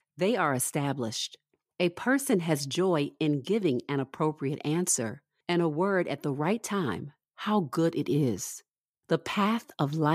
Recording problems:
abrupt cut into speech; at the end

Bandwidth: 15 kHz